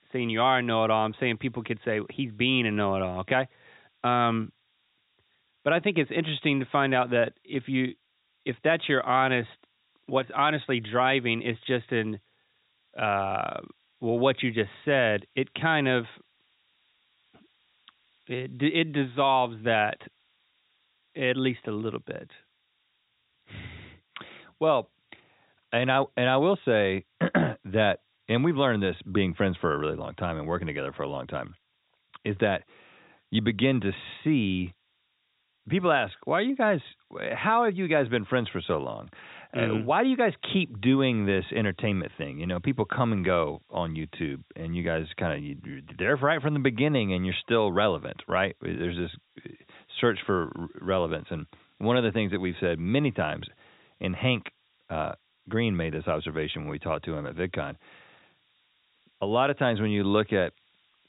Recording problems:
high frequencies cut off; severe; nothing above 4 kHz
hiss; very faint; throughout; 40 dB below the speech

